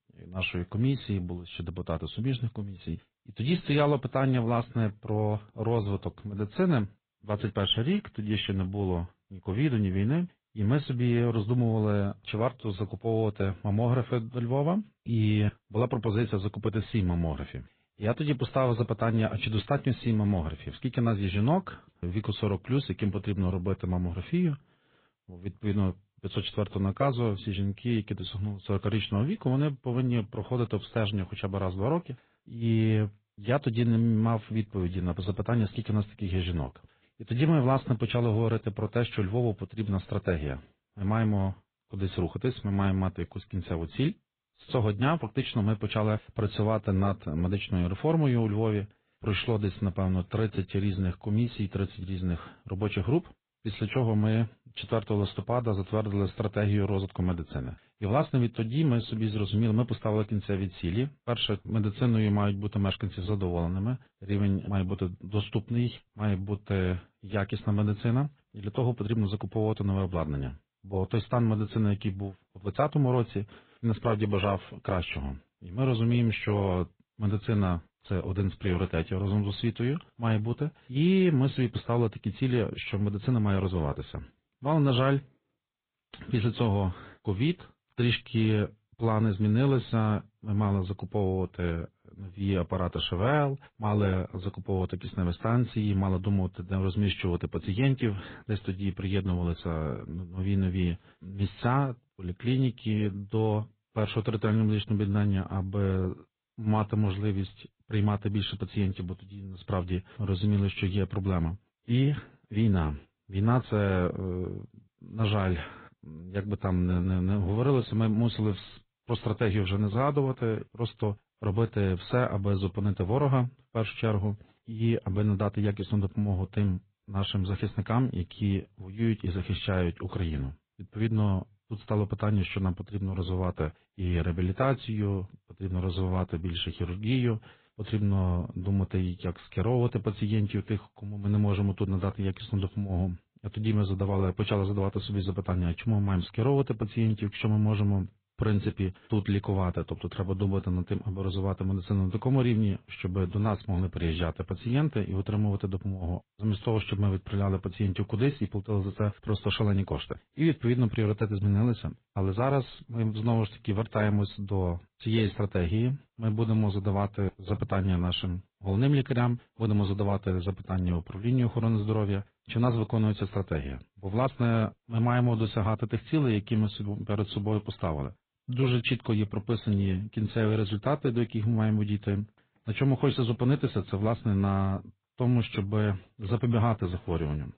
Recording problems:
high frequencies cut off; severe; nothing above 4 kHz
garbled, watery; slightly

